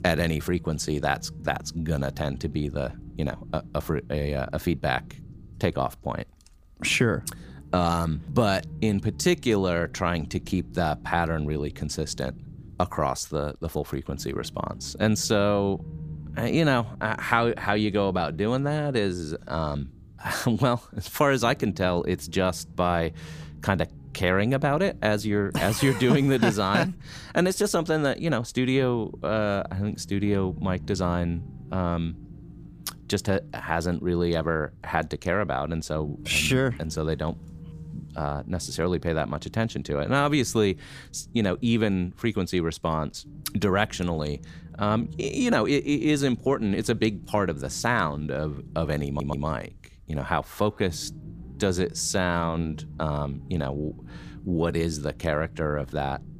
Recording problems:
low rumble; faint; throughout; 25 dB below the speech
audio stuttering; at 49 s

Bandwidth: 15 kHz